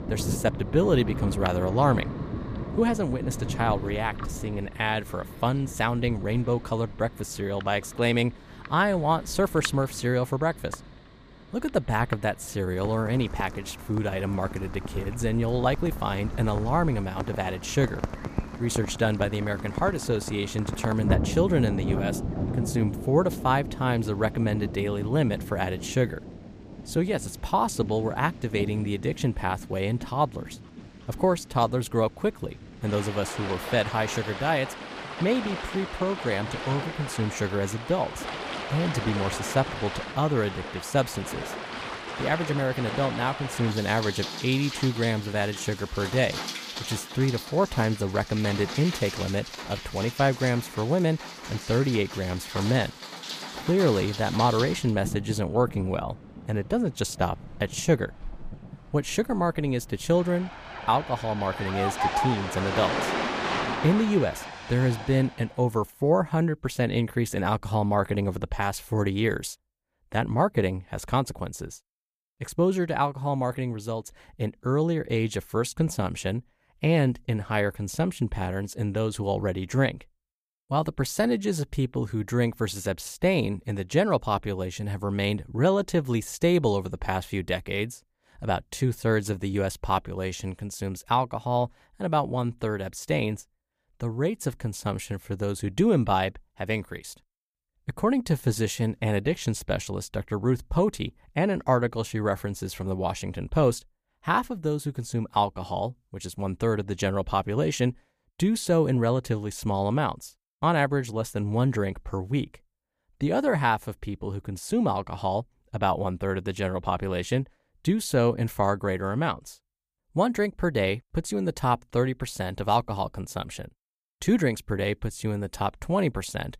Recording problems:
rain or running water; loud; until 1:05; 8 dB below the speech

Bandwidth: 15 kHz